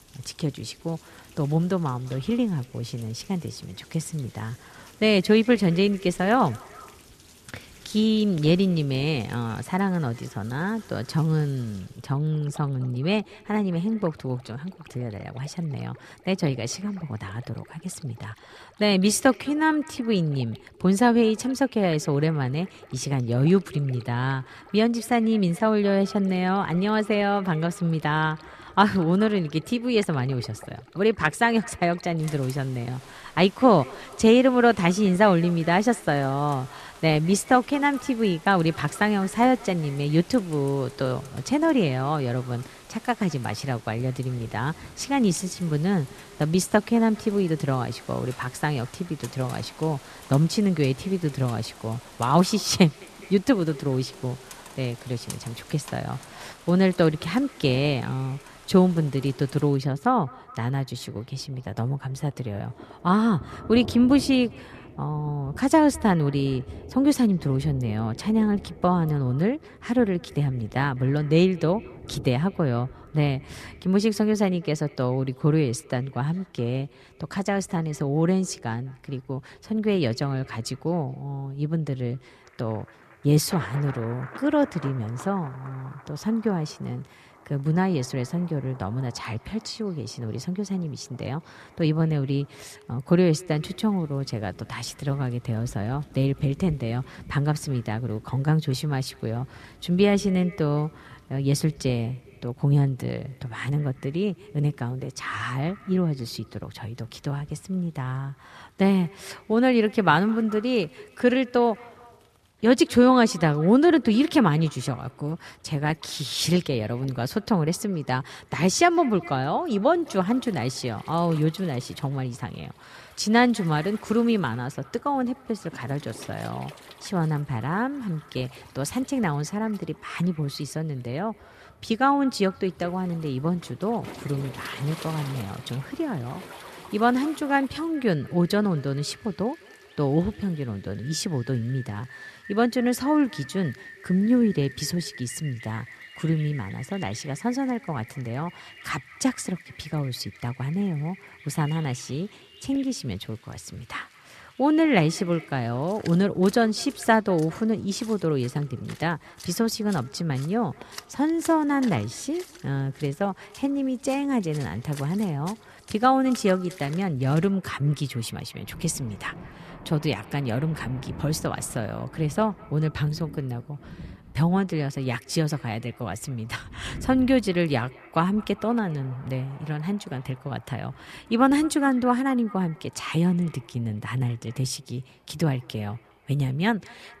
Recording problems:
echo of what is said; faint; throughout; 210 ms later, 25 dB below the speech
rain or running water; faint; throughout; 20 dB below the speech

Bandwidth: 14 kHz